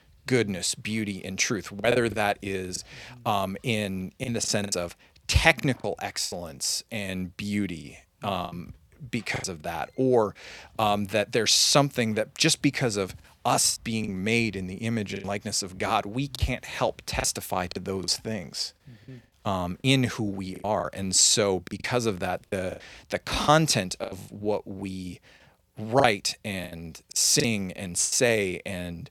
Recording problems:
choppy; very; 8% of the speech affected

